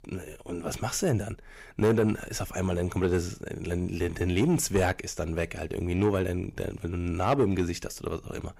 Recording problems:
distortion; slight; 10 dB below the speech

